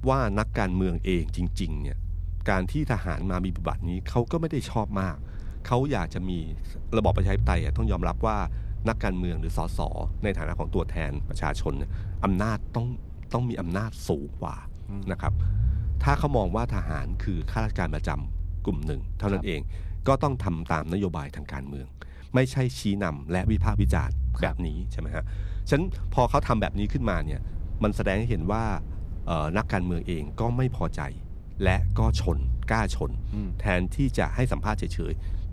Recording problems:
low rumble; noticeable; throughout; 20 dB below the speech

